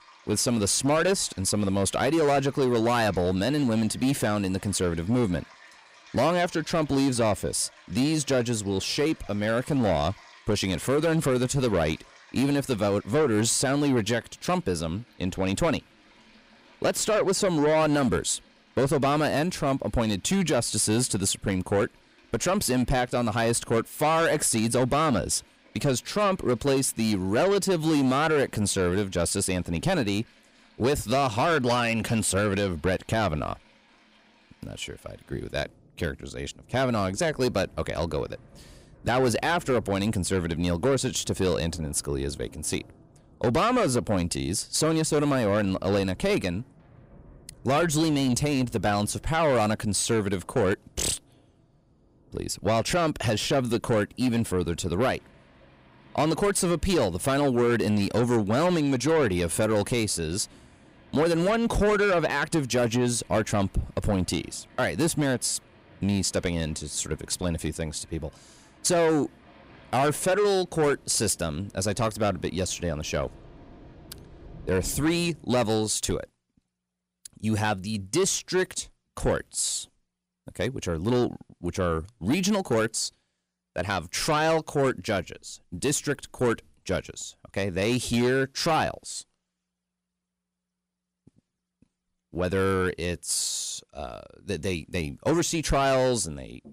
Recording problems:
distortion; slight; 10 dB below the speech
rain or running water; faint; until 1:15; 25 dB below the speech

